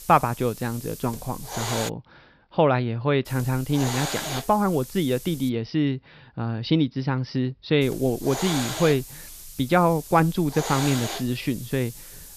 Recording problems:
high frequencies cut off; noticeable; nothing above 5.5 kHz
hiss; loud; until 2 s, from 3.5 to 5.5 s and from 8 s on; 9 dB below the speech

